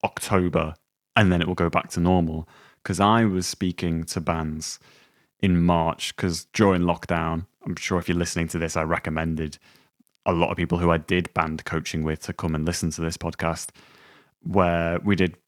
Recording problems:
none

